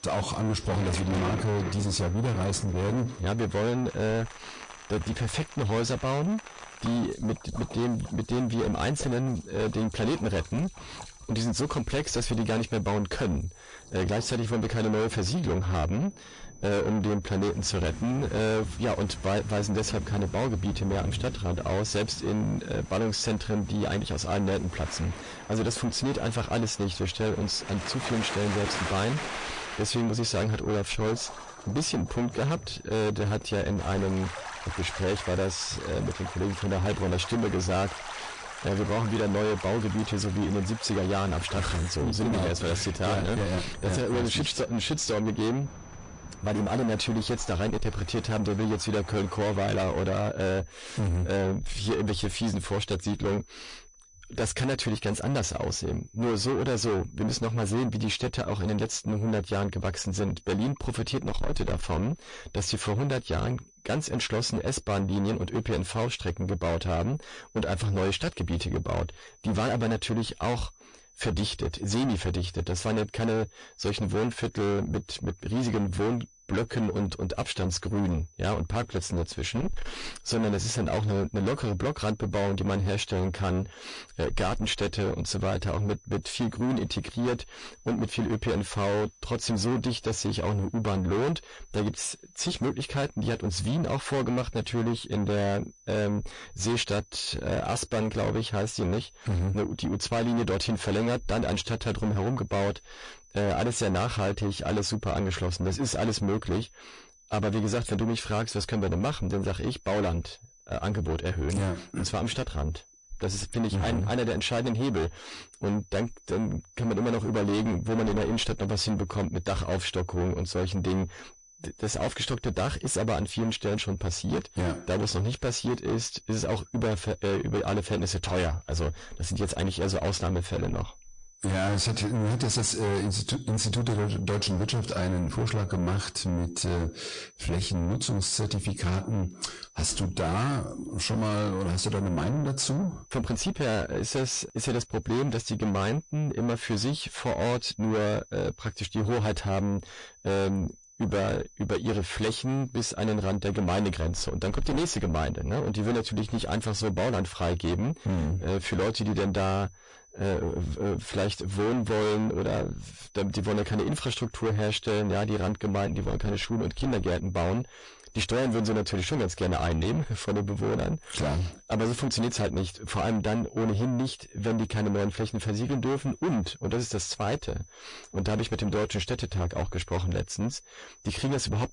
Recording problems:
distortion; heavy; 6 dB below the speech
garbled, watery; slightly; nothing above 10 kHz
rain or running water; noticeable; until 50 s; 10 dB below the speech
high-pitched whine; faint; throughout; 6 kHz, 25 dB below the speech

